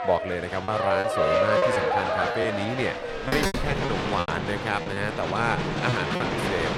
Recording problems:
crowd noise; very loud; throughout; 2 dB above the speech
choppy; very; 9% of the speech affected
door banging; loud; from 3 to 6 s; peak 2 dB above the speech

